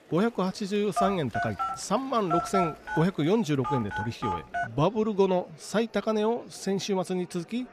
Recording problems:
murmuring crowd; faint; throughout; 25 dB below the speech
phone ringing; loud; from 1 to 4.5 s; peak 1 dB above the speech

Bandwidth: 14.5 kHz